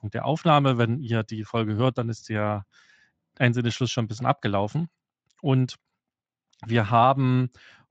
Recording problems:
garbled, watery; slightly

